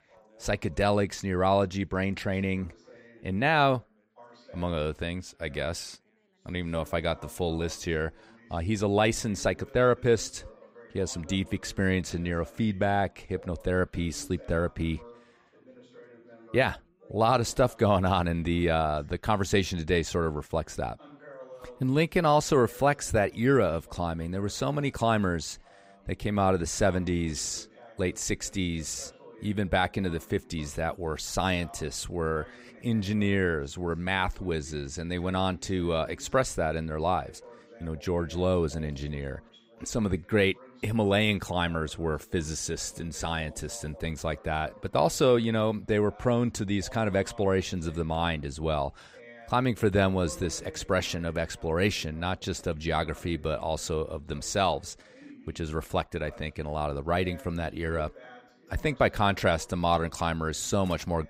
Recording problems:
background chatter; faint; throughout; 3 voices, 25 dB below the speech

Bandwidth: 15.5 kHz